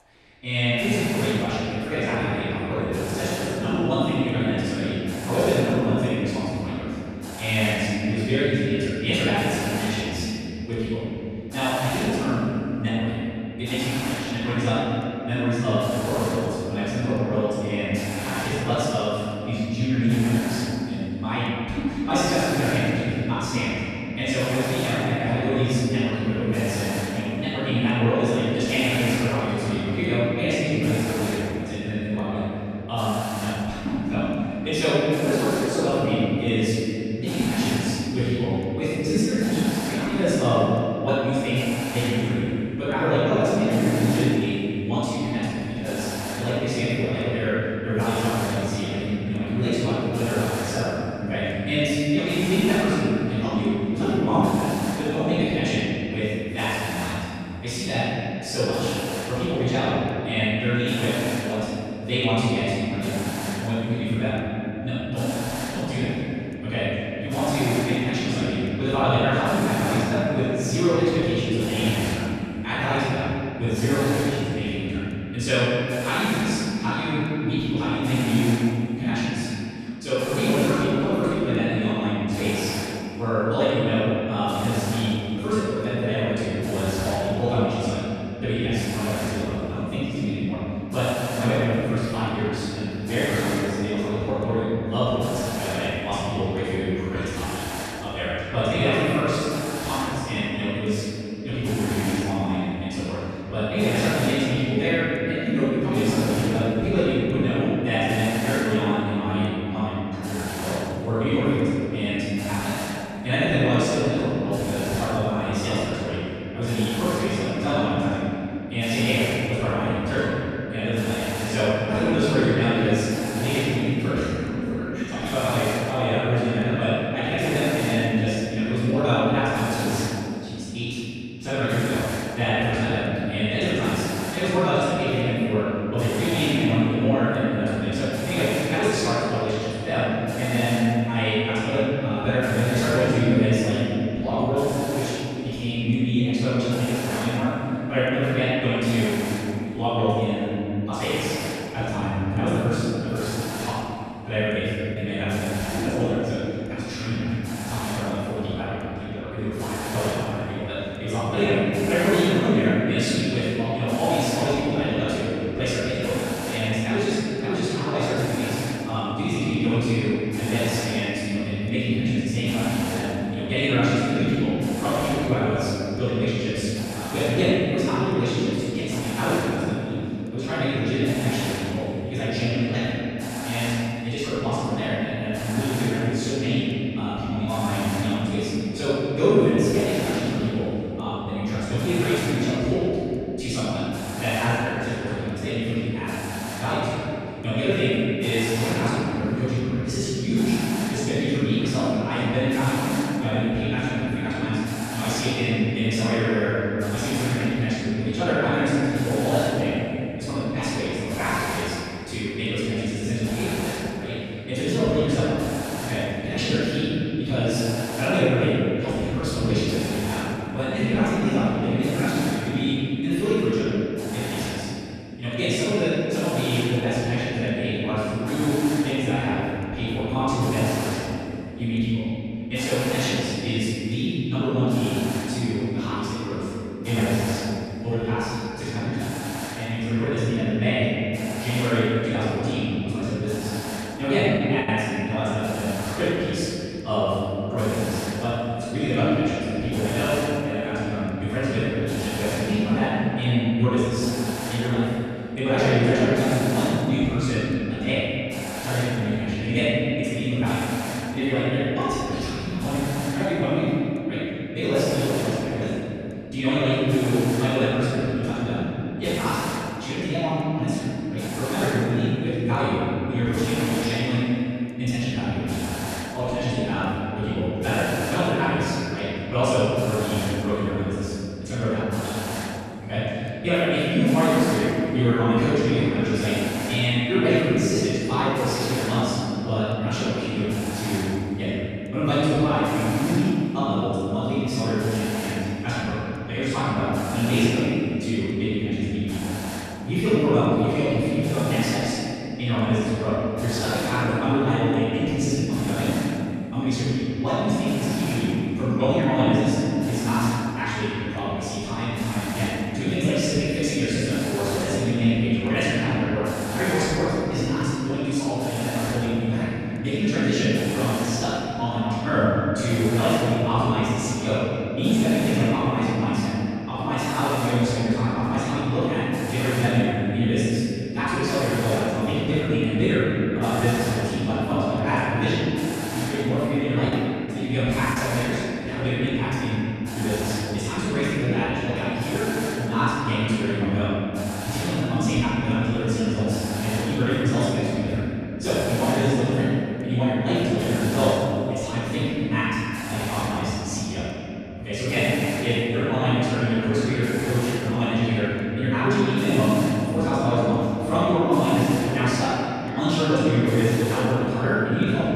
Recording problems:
room echo; strong; dies away in 3 s
off-mic speech; far
wrong speed, natural pitch; too fast; 1.6 times normal speed
hiss; very faint; throughout; 10 dB below the speech
choppy; occasionally; at 2:35, at 4:05 and from 5:37 to 5:38; 3% of the speech affected

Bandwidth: 14 kHz